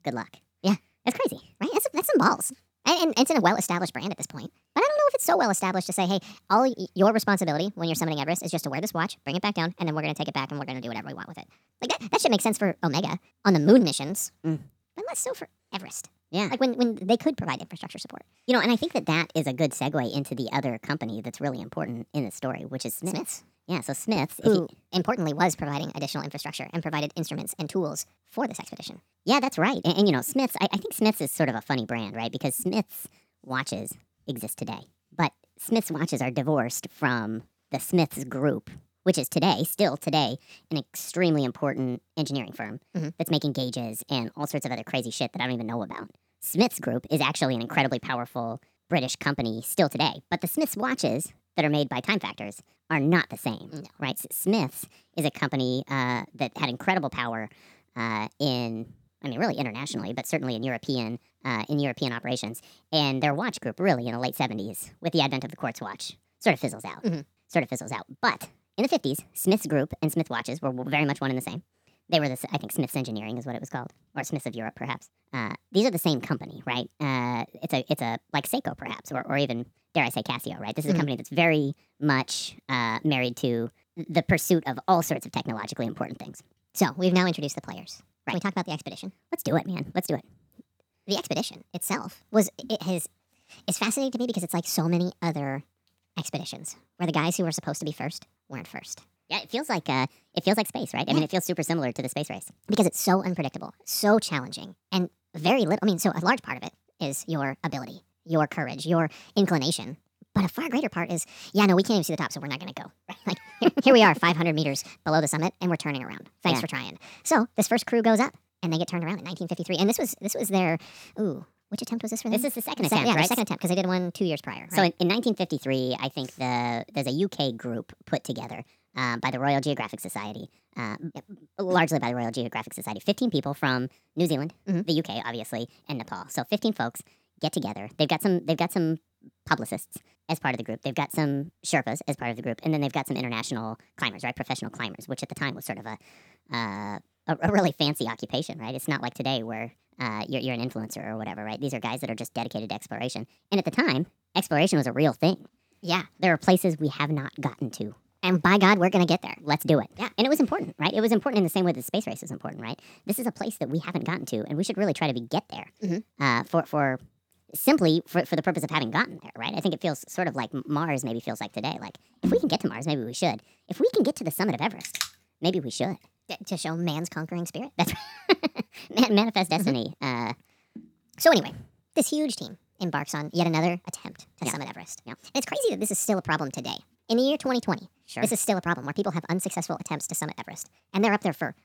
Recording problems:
wrong speed and pitch; too fast and too high; 1.5 times normal speed

